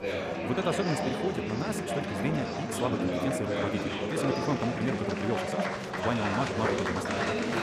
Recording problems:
wrong speed, natural pitch; too fast; 1.5 times normal speed
murmuring crowd; very loud; throughout; 2 dB above the speech

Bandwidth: 15.5 kHz